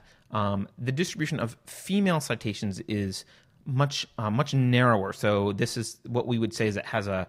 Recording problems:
none

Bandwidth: 15.5 kHz